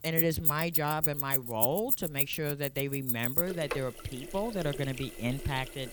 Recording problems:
household noises; very loud; throughout; 3 dB above the speech

